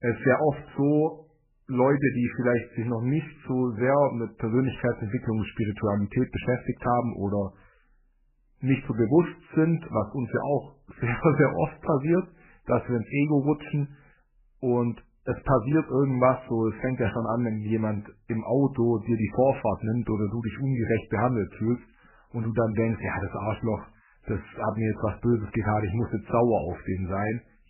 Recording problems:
garbled, watery; badly; nothing above 2.5 kHz

